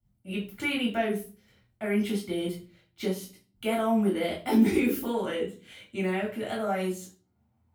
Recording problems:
off-mic speech; far
room echo; slight; dies away in 0.3 s

